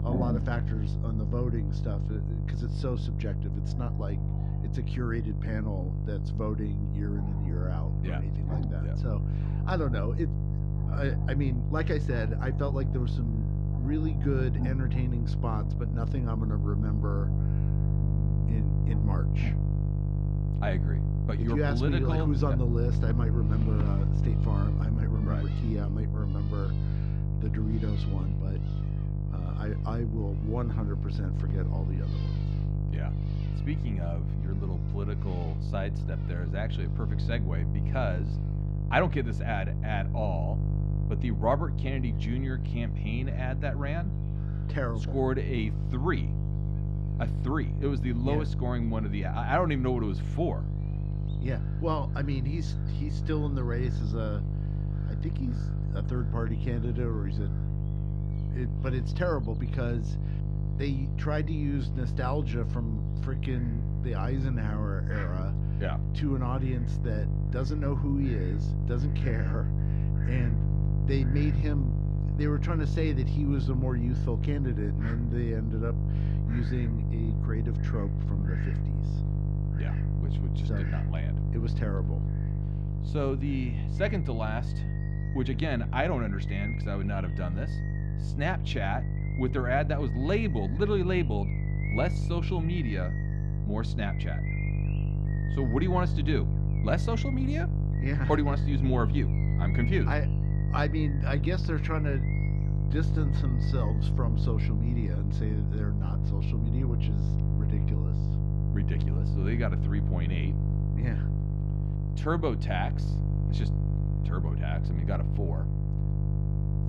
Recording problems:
muffled; very slightly; fading above 3.5 kHz
electrical hum; loud; throughout; 50 Hz, 6 dB below the speech
animal sounds; noticeable; throughout; 15 dB below the speech

